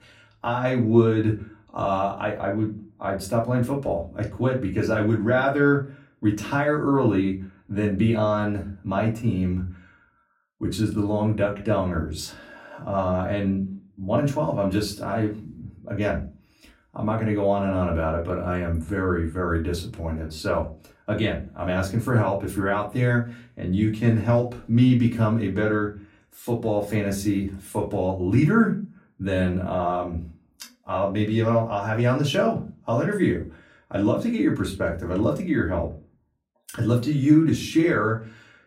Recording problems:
off-mic speech; far
room echo; very slight; dies away in 0.3 s

